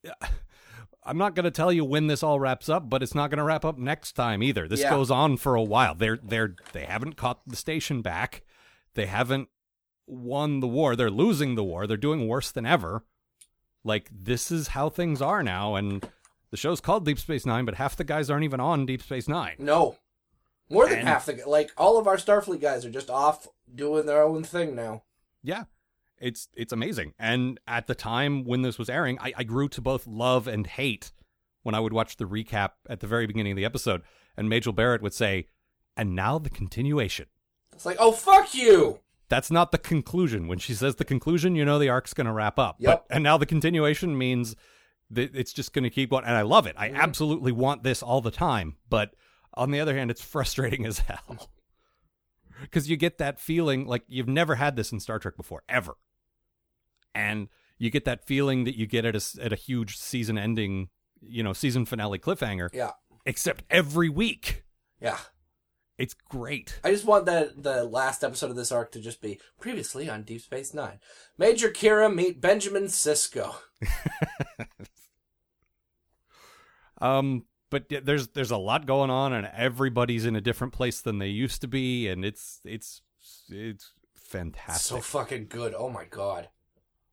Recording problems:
uneven, jittery; strongly; from 3.5 s to 1:22

